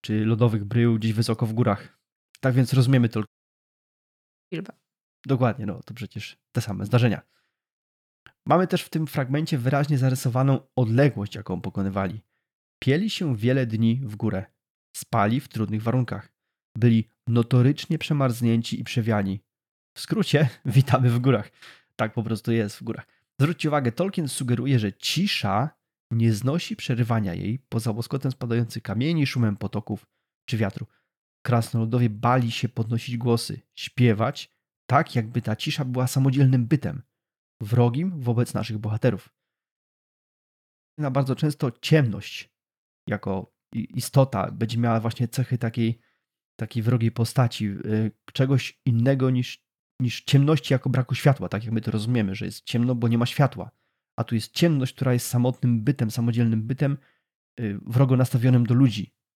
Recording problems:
audio cutting out; at 3.5 s for 1 s and at 40 s for 1 s

